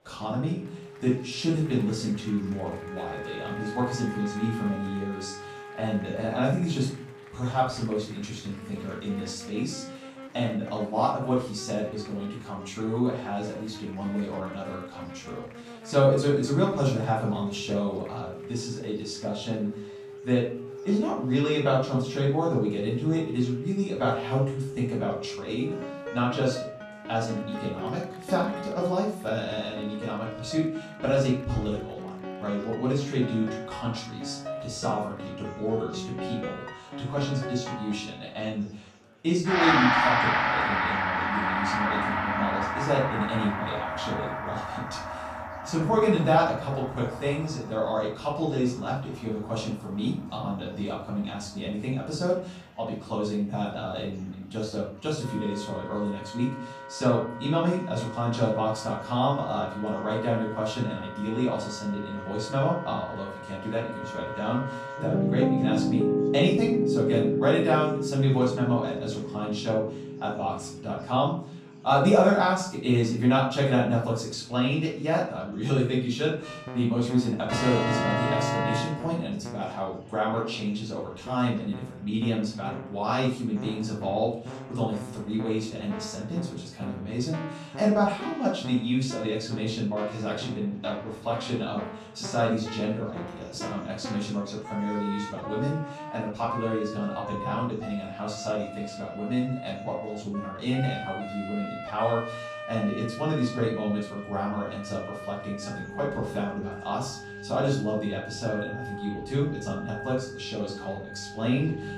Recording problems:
off-mic speech; far
room echo; noticeable; dies away in 0.4 s
background music; loud; throughout; 5 dB below the speech
murmuring crowd; faint; throughout; 25 dB below the speech

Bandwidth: 15 kHz